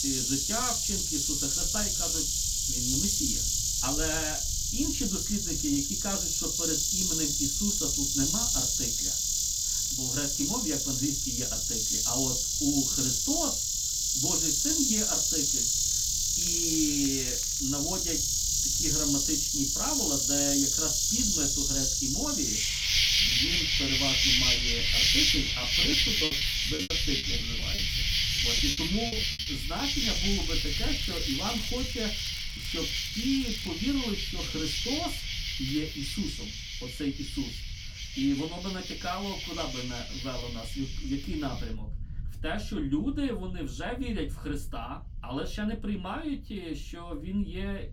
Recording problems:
off-mic speech; far
room echo; very slight; dies away in 0.2 s
animal sounds; very loud; throughout; 9 dB above the speech
crackling; noticeable; from 16 to 18 s and from 30 to 34 s; 15 dB below the speech
low rumble; faint; throughout; 20 dB below the speech
choppy; very; from 26 to 29 s; 13% of the speech affected

